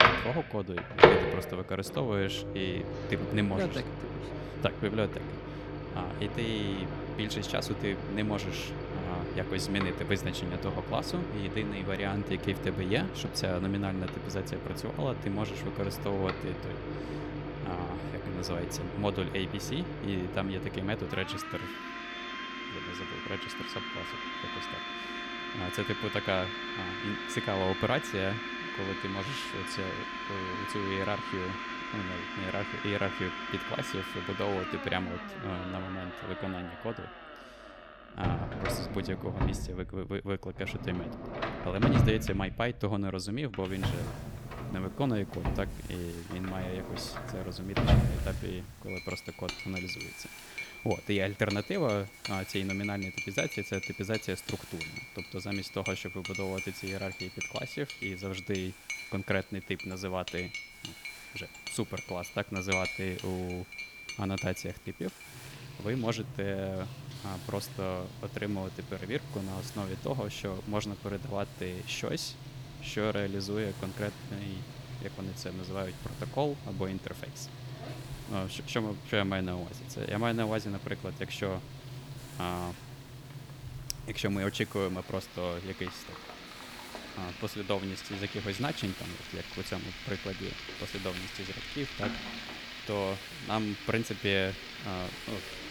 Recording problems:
household noises; loud; throughout; 2 dB below the speech
hiss; noticeable; from 44 s on; 20 dB below the speech

